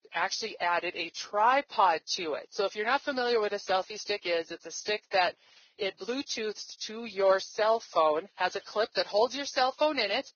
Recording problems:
garbled, watery; badly; nothing above 6.5 kHz
thin; very; fading below 450 Hz

